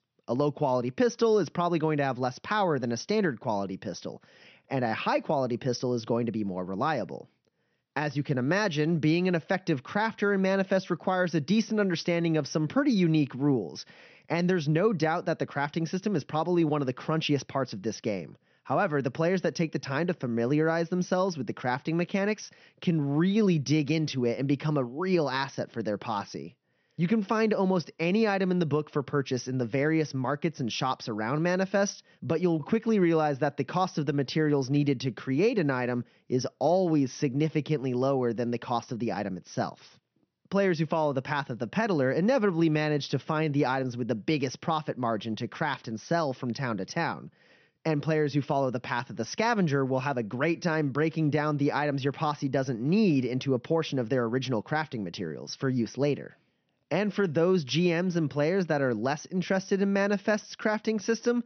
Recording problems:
high frequencies cut off; noticeable; nothing above 6 kHz

